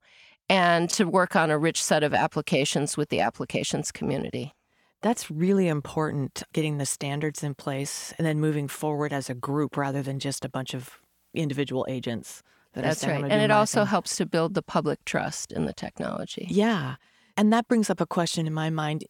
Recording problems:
none

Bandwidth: 18 kHz